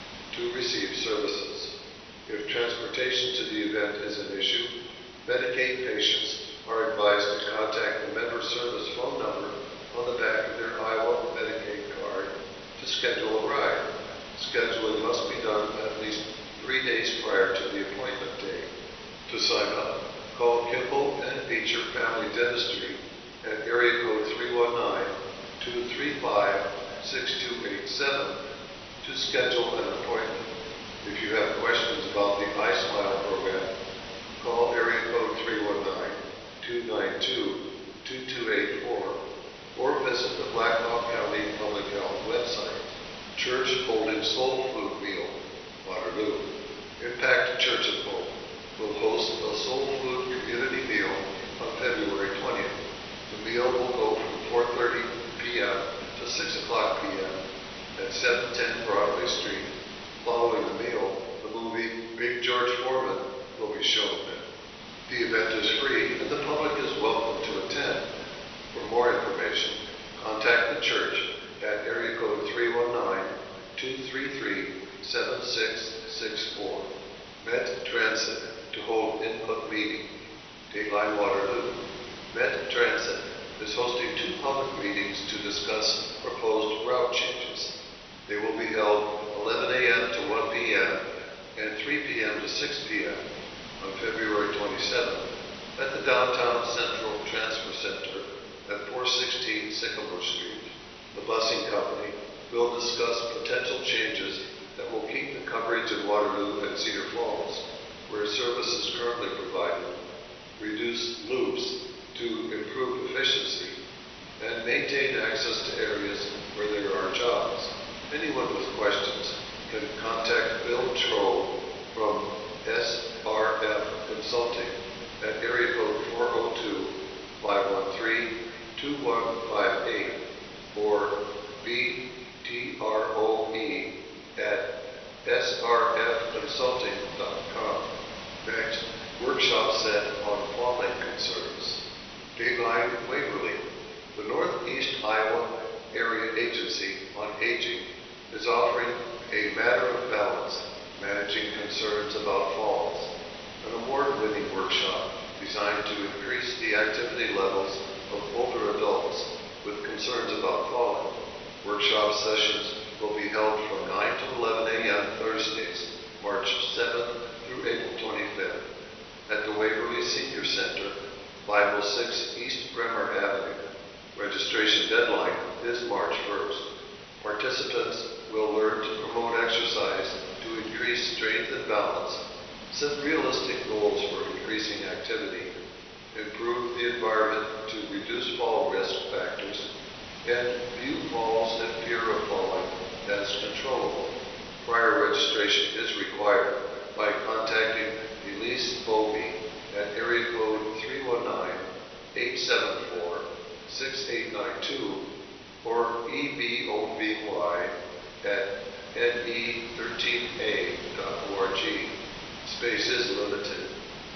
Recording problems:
off-mic speech; far
thin; very; fading below 600 Hz
room echo; noticeable; dies away in 1.1 s
echo of what is said; faint; throughout; 430 ms later, 20 dB below the speech
garbled, watery; slightly; nothing above 6 kHz
hiss; noticeable; throughout; 15 dB below the speech

